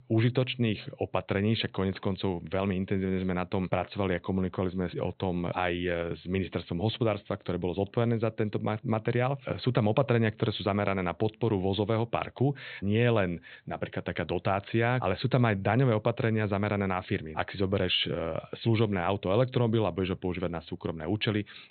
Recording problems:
high frequencies cut off; severe; nothing above 4 kHz

